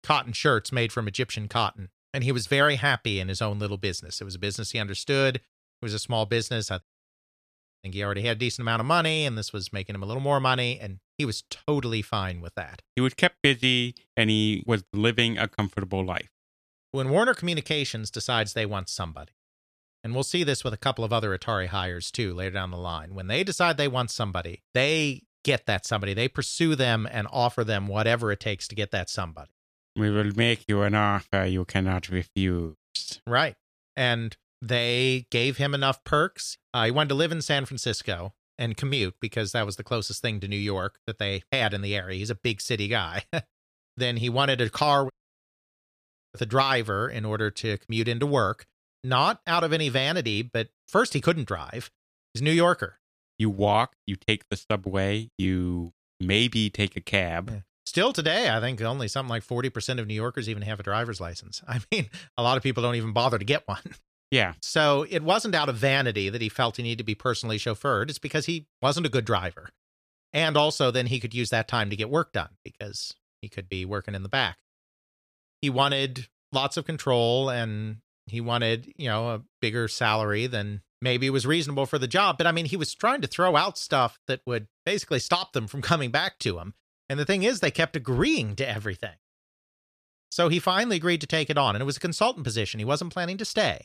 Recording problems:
audio cutting out; at 7 s for 1 s and at 45 s for 1 s

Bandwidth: 14.5 kHz